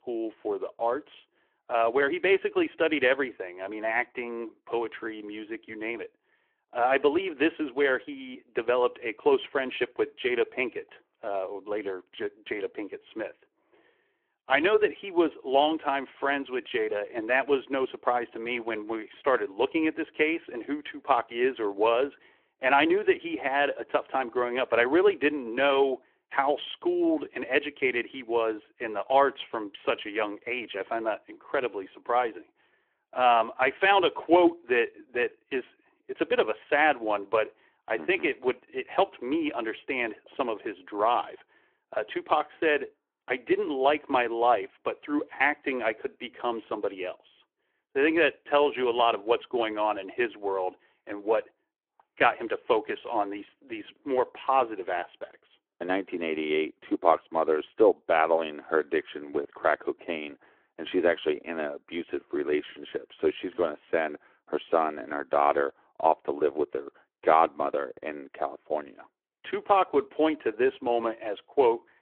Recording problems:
phone-call audio

